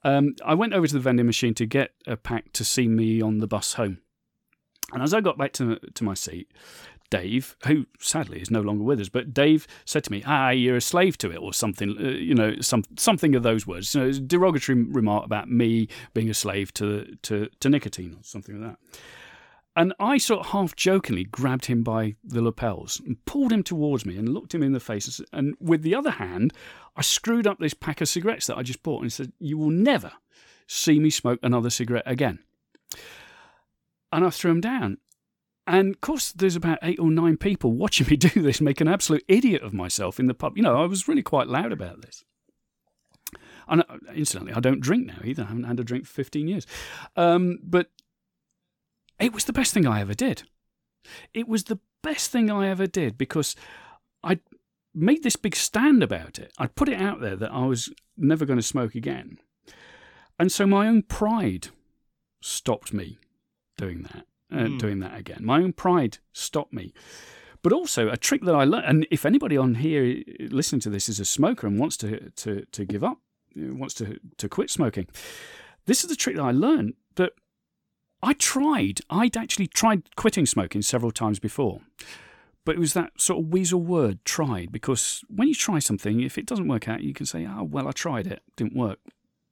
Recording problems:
none

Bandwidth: 18 kHz